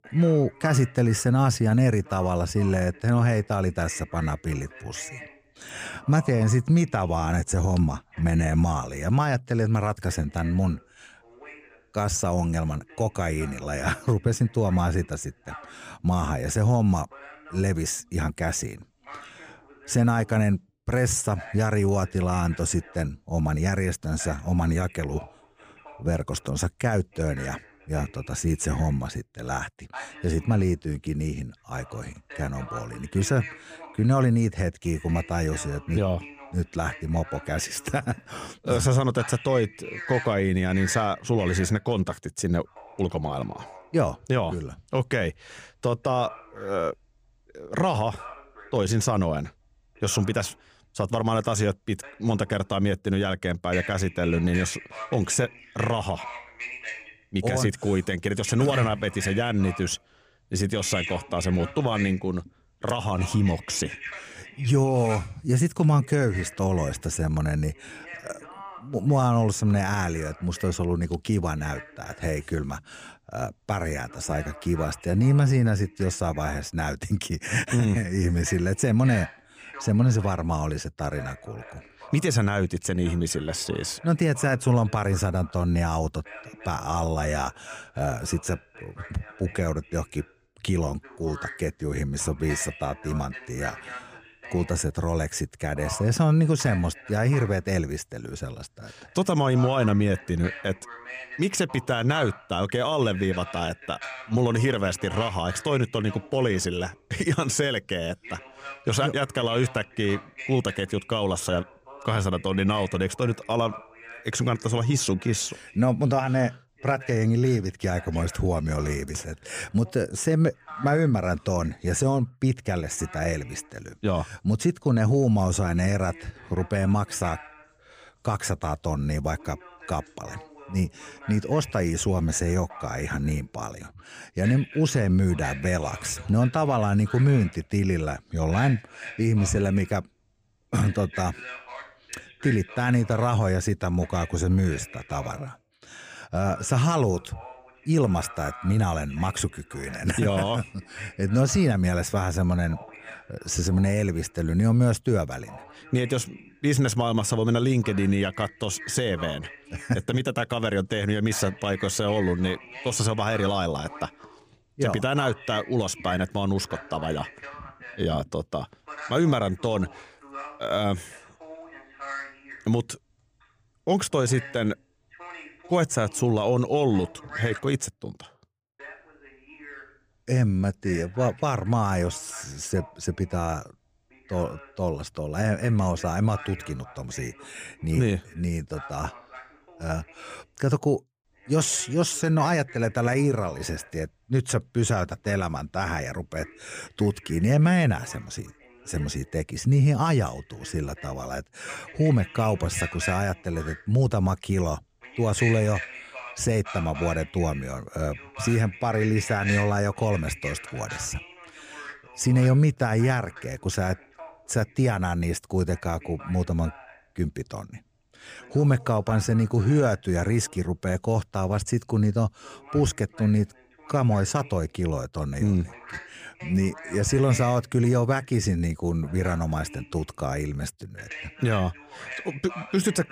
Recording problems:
voice in the background; noticeable; throughout; 15 dB below the speech

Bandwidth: 15 kHz